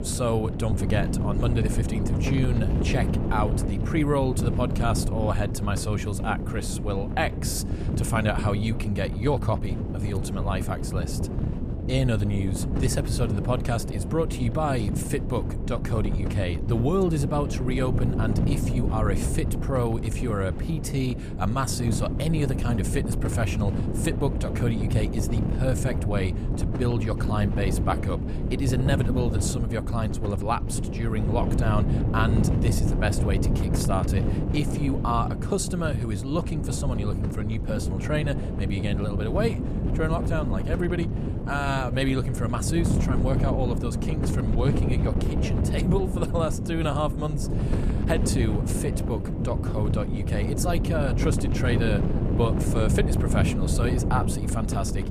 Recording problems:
wind noise on the microphone; heavy; 5 dB below the speech

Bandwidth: 14.5 kHz